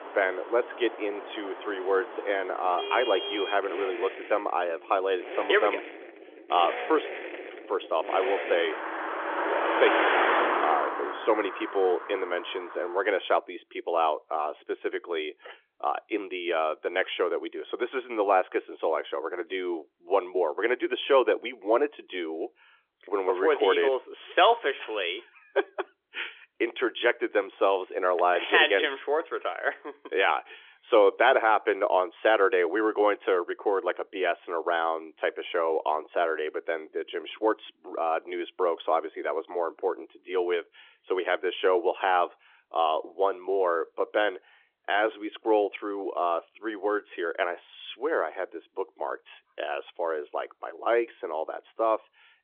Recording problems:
phone-call audio; nothing above 3.5 kHz
traffic noise; loud; until 13 s; 4 dB below the speech

